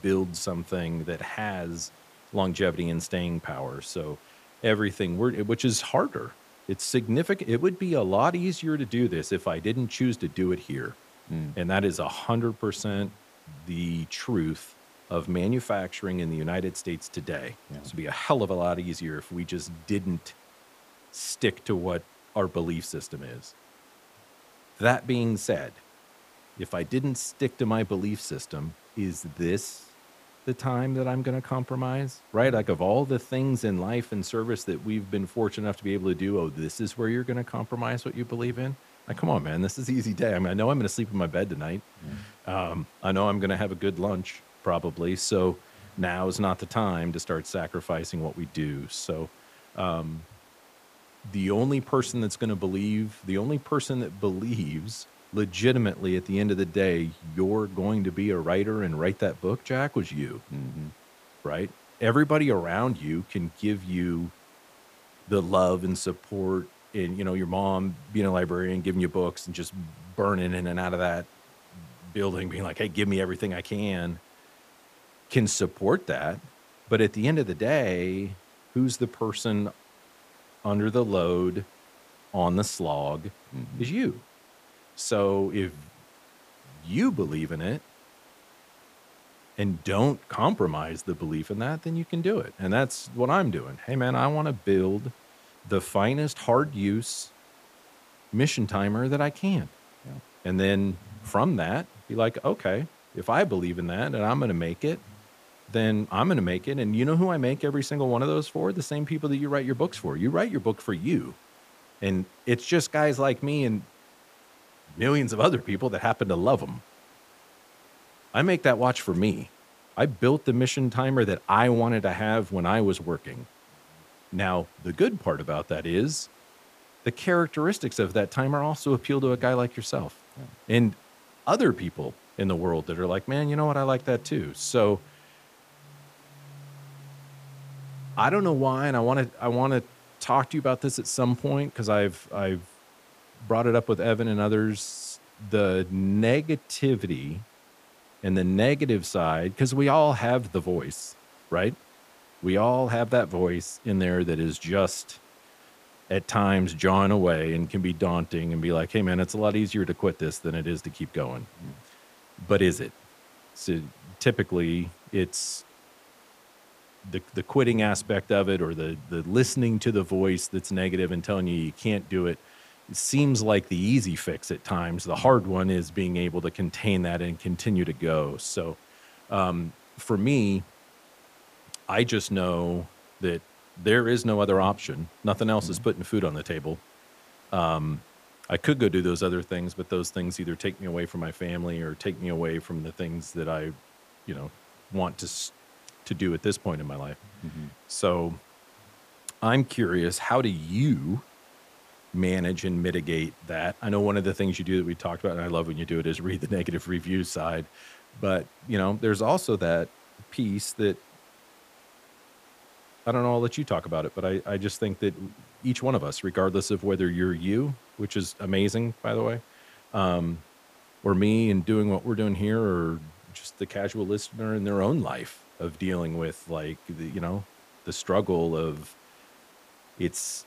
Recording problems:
hiss; faint; throughout; 25 dB below the speech

